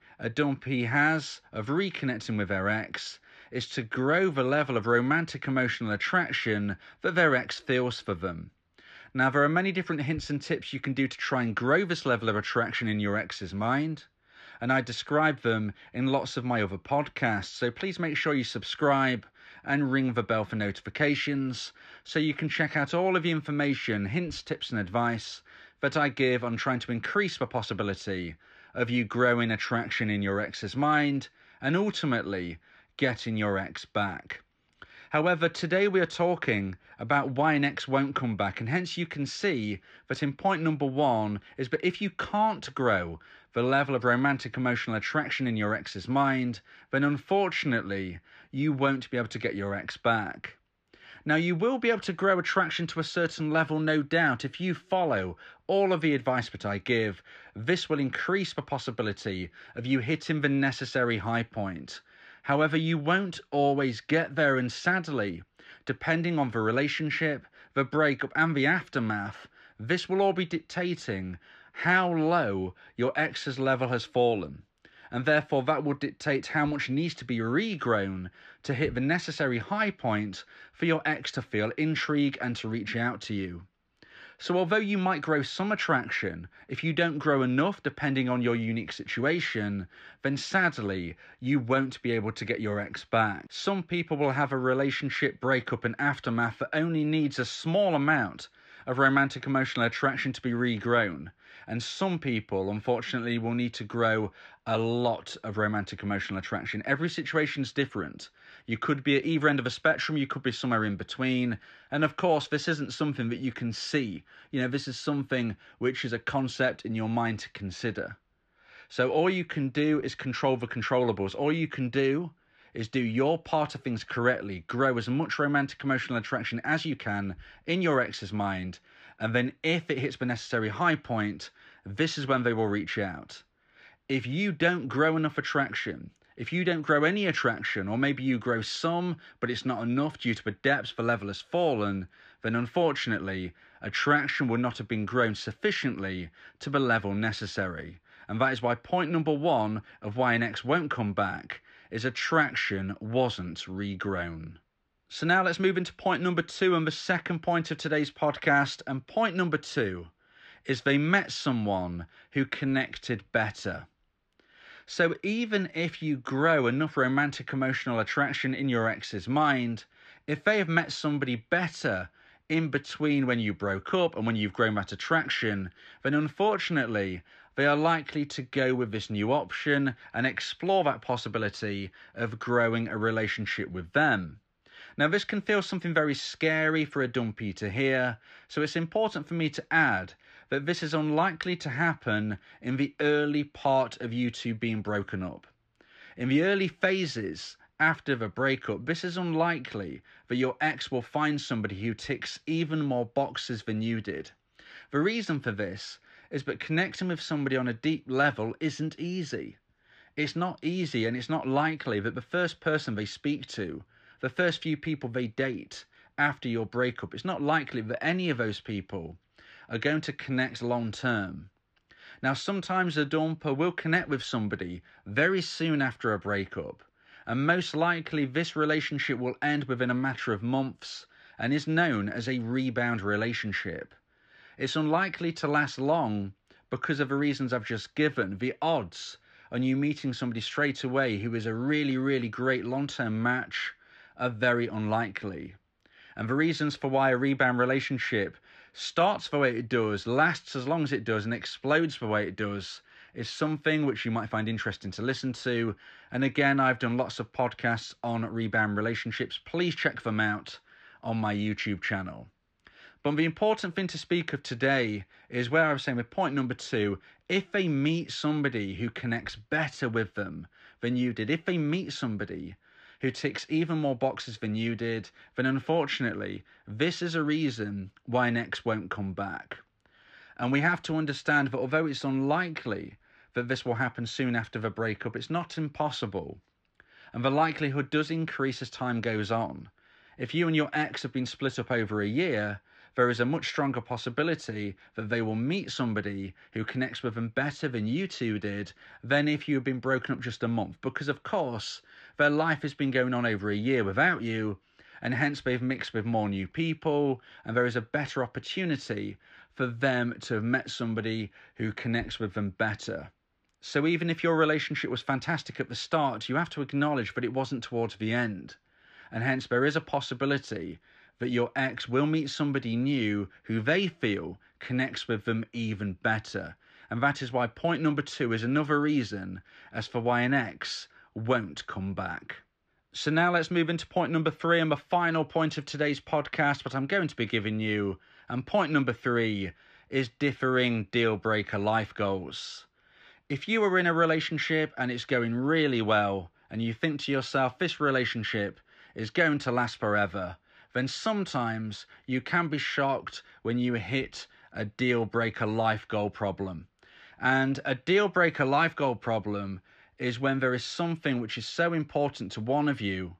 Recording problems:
muffled; slightly; fading above 3 kHz

